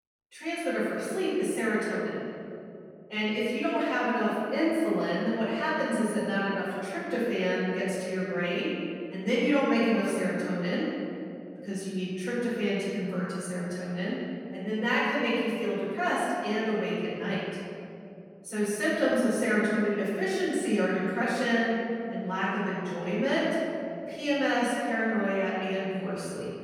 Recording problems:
room echo; strong; dies away in 2.9 s
off-mic speech; far

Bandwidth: 18 kHz